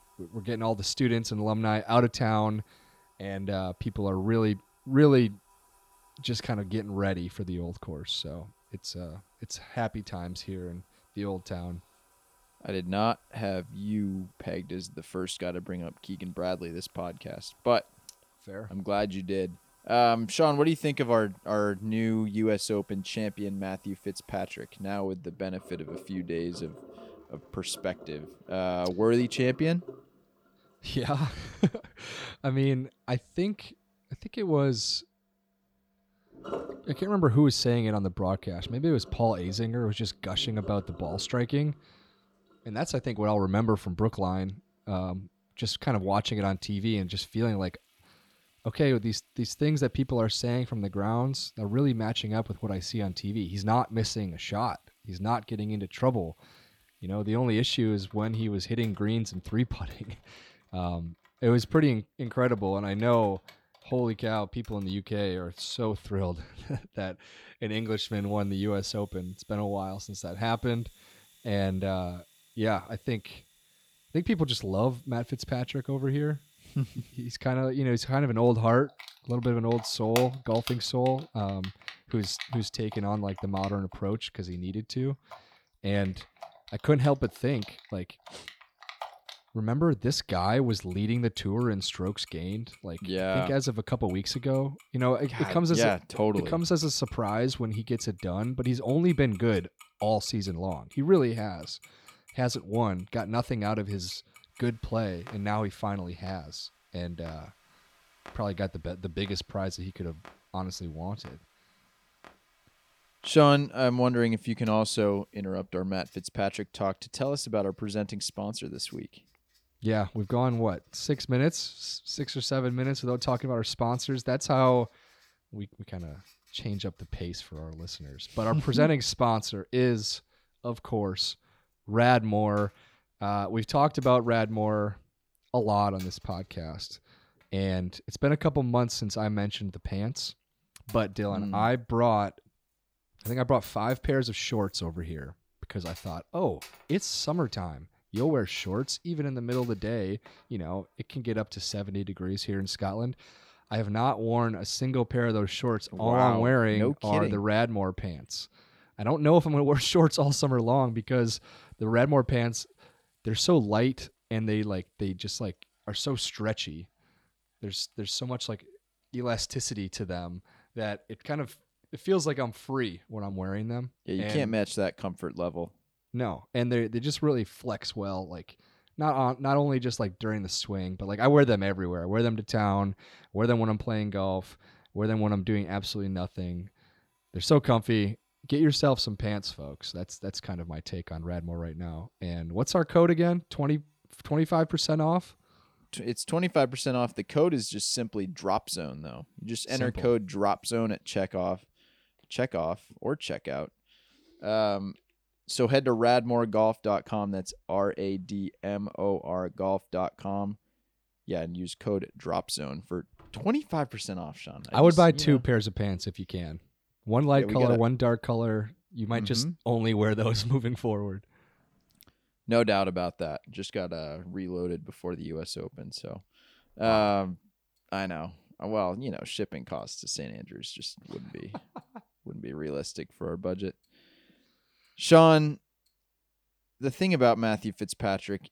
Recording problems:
household noises; faint; throughout; 25 dB below the speech

